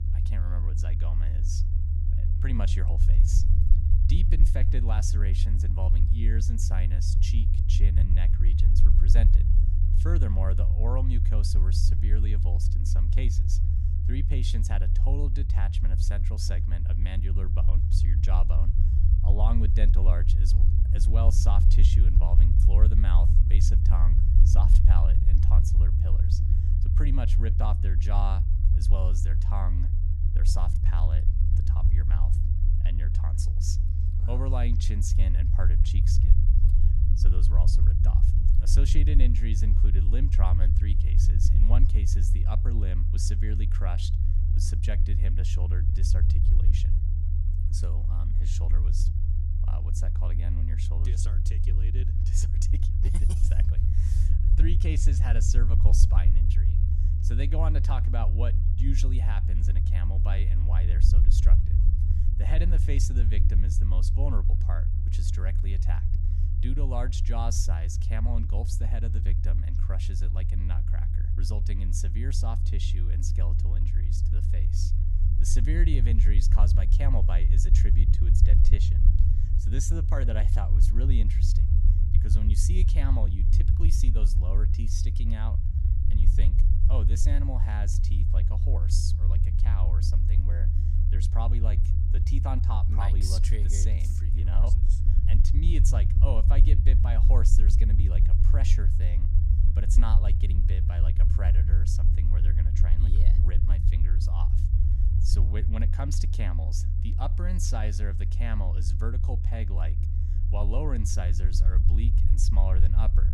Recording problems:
low rumble; loud; throughout; 2 dB below the speech

